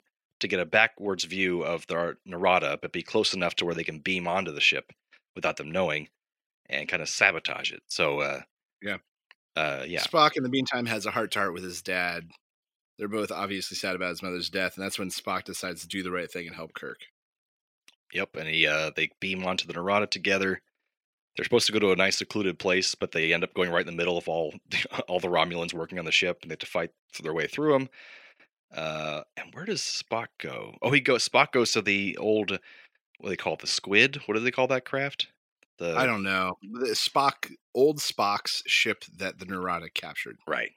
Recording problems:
thin; somewhat; fading below 350 Hz

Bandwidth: 16 kHz